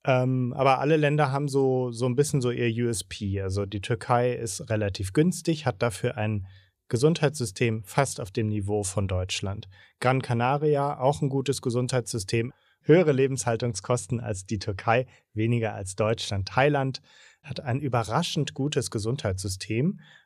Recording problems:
none

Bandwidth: 14.5 kHz